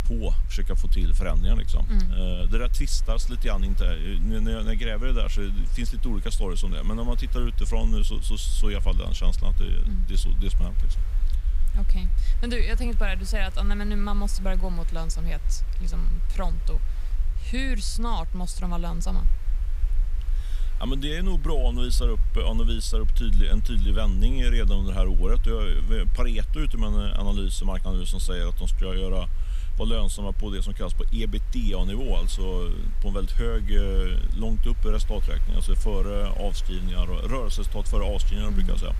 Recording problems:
low rumble; noticeable; throughout; 20 dB below the speech
hiss; faint; throughout; 20 dB below the speech

